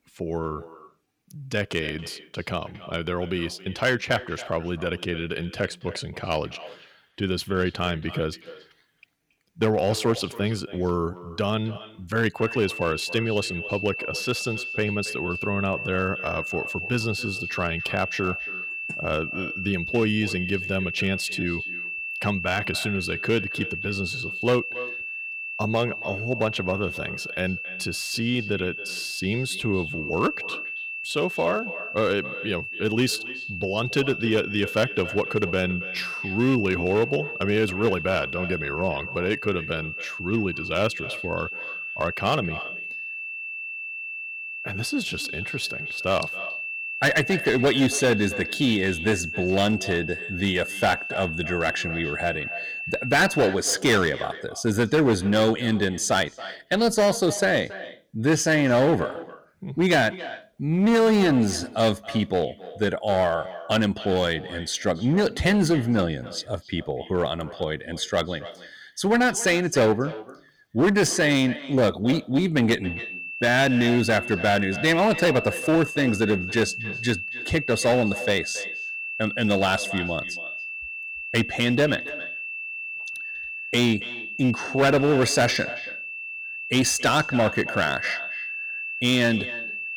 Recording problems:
echo of what is said; noticeable; throughout; 280 ms later, 15 dB below the speech
distortion; slight; 4% of the sound clipped
high-pitched whine; loud; from 12 to 53 s and from 1:13 on; 2.5 kHz, 6 dB below the speech

